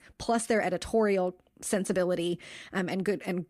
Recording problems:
none

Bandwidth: 15 kHz